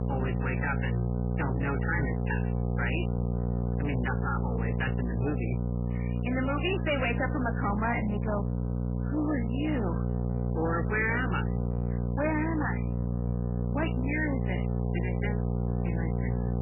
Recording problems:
garbled, watery; badly; nothing above 3 kHz
distortion; slight; 19% of the sound clipped
electrical hum; loud; throughout; 60 Hz, 6 dB below the speech

